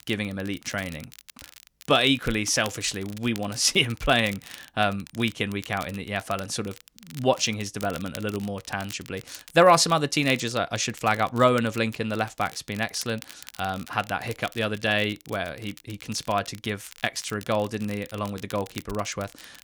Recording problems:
crackle, like an old record; noticeable; 20 dB below the speech

